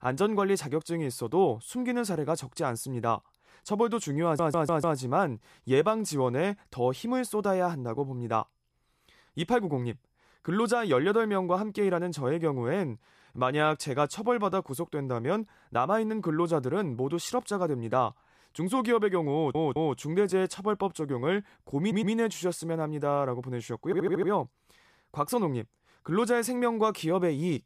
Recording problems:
audio stuttering; 4 times, first at 4 s

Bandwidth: 14.5 kHz